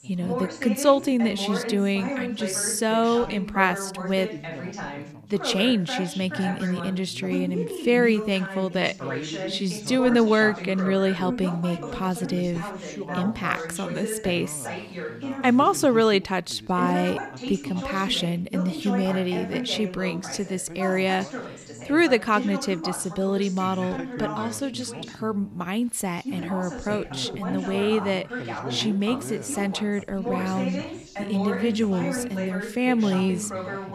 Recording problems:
background chatter; loud; throughout; 2 voices, 8 dB below the speech

